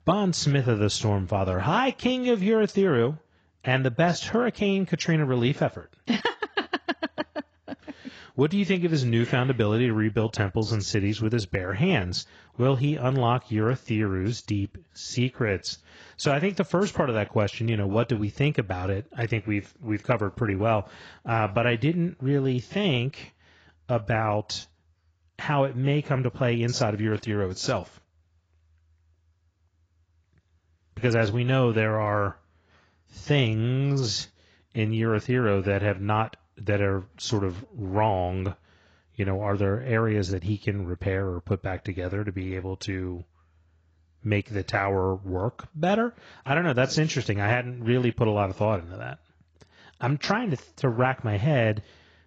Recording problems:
garbled, watery; badly; nothing above 7.5 kHz

